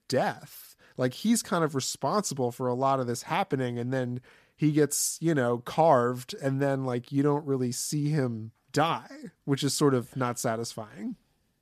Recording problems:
none

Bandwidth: 14.5 kHz